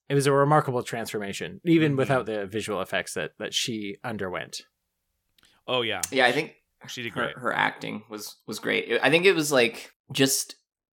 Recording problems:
none

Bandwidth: 17.5 kHz